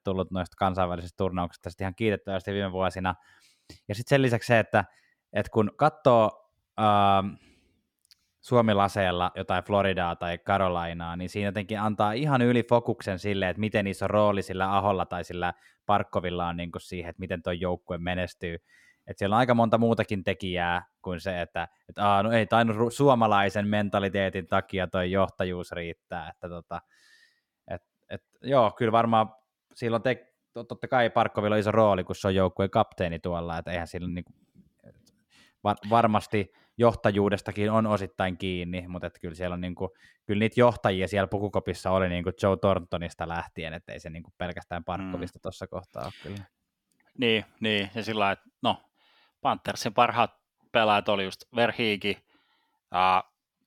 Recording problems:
none

